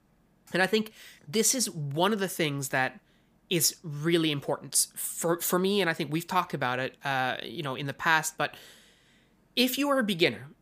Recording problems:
none

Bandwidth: 15 kHz